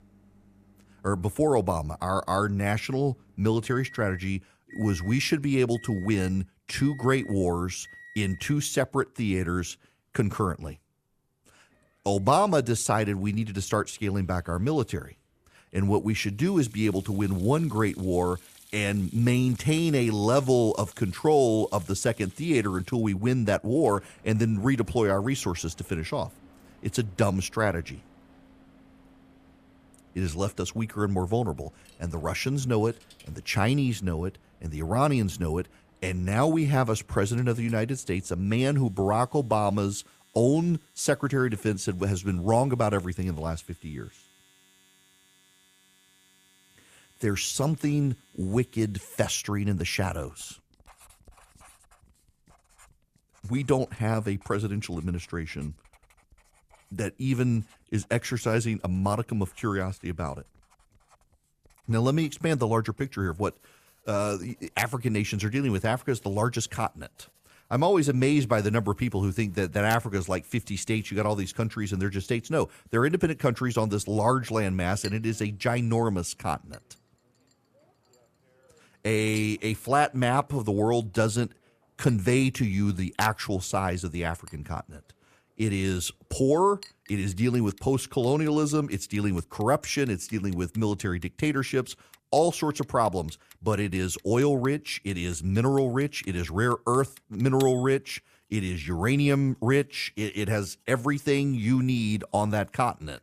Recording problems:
household noises; faint; throughout; 25 dB below the speech

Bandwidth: 14.5 kHz